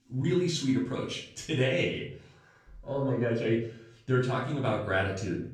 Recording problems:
off-mic speech; far
room echo; slight; dies away in 0.5 s

